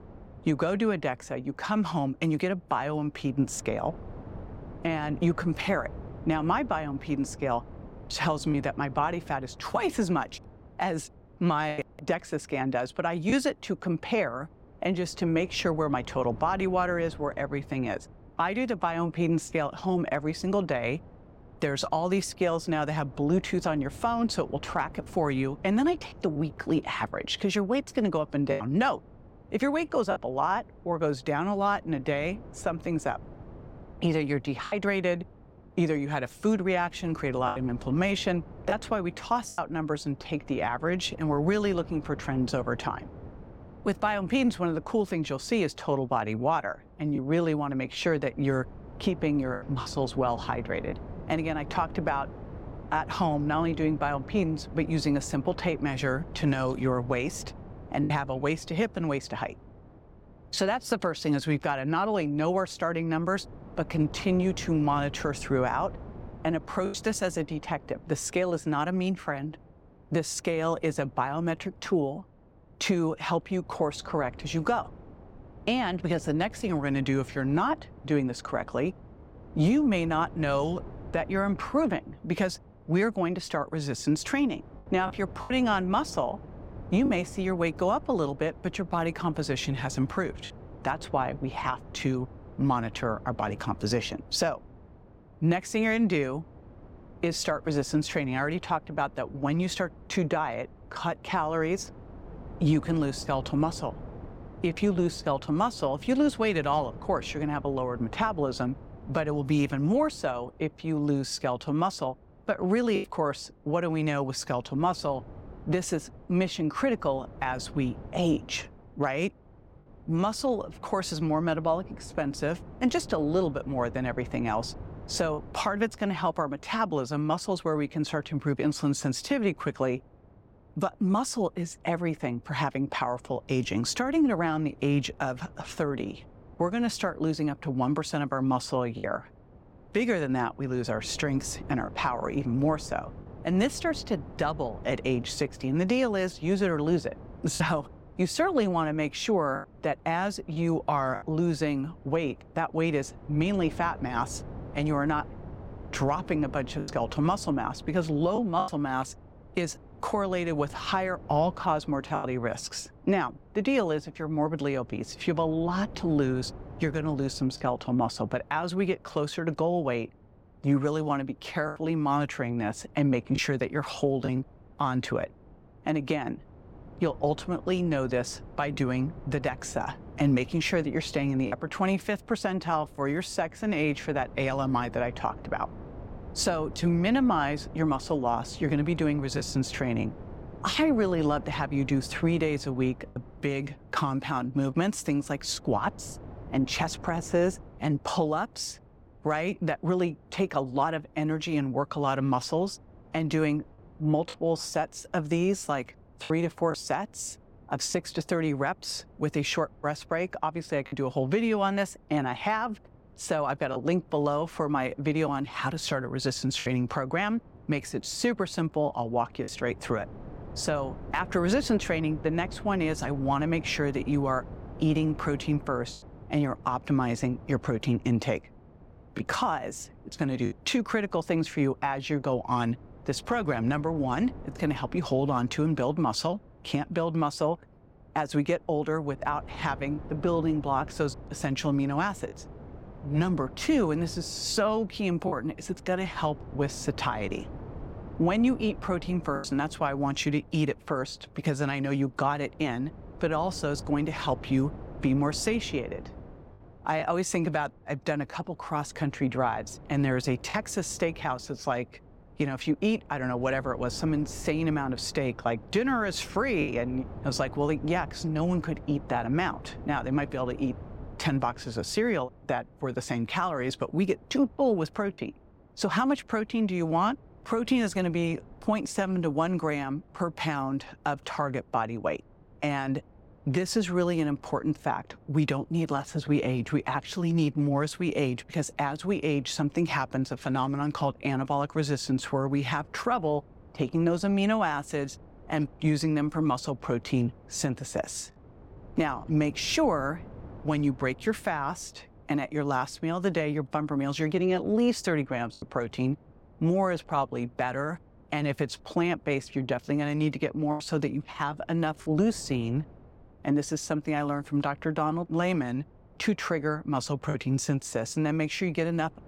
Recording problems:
wind noise on the microphone; occasional gusts; 20 dB below the speech
choppy; occasionally; 1% of the speech affected

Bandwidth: 16.5 kHz